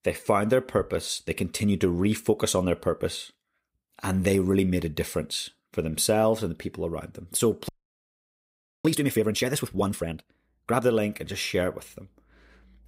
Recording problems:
audio freezing; at 7.5 s for 1 s

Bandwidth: 15.5 kHz